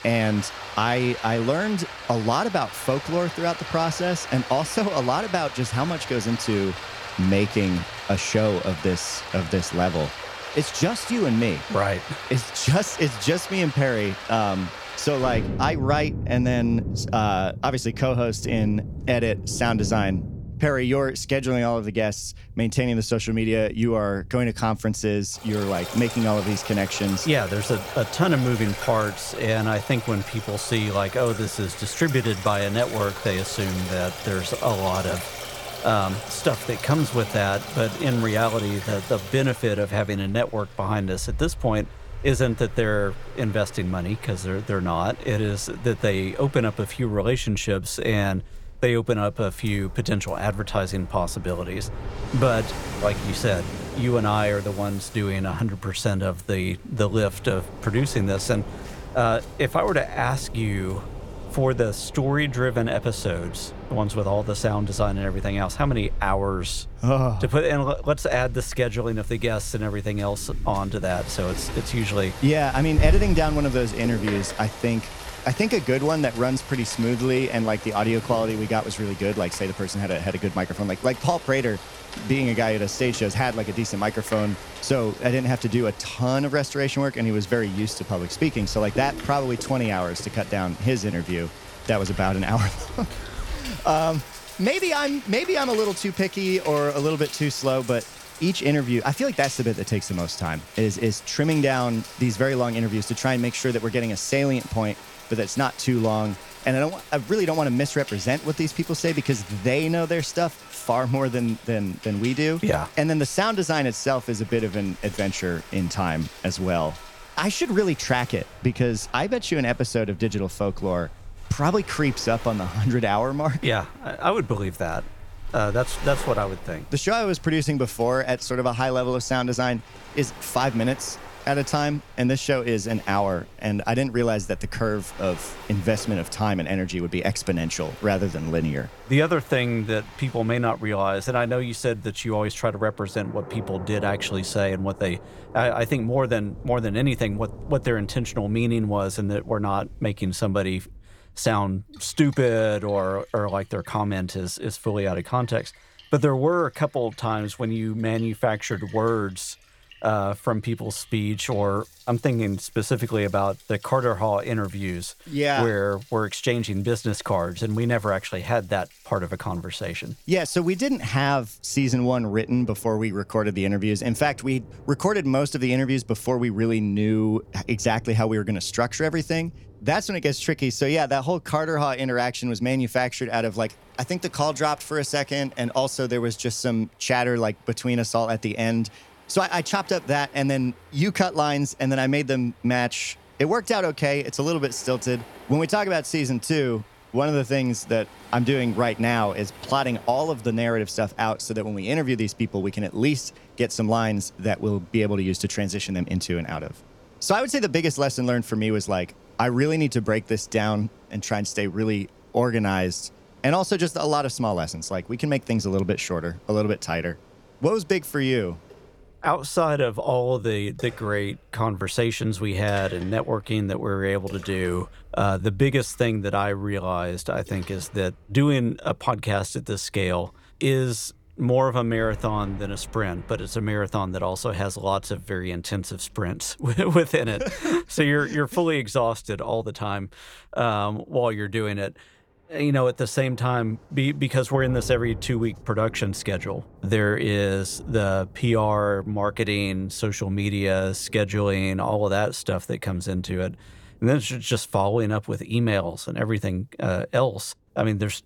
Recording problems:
rain or running water; noticeable; throughout; 10 dB below the speech

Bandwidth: 18.5 kHz